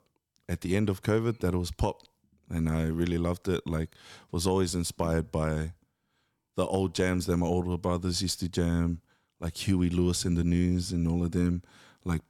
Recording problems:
none

